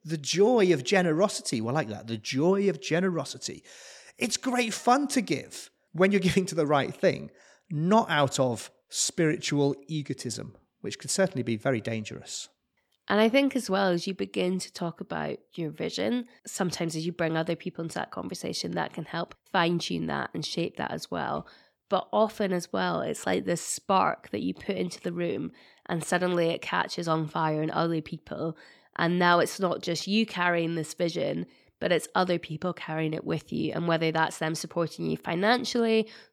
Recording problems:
none

